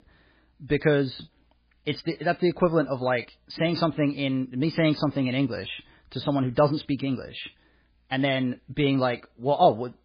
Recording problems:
garbled, watery; badly

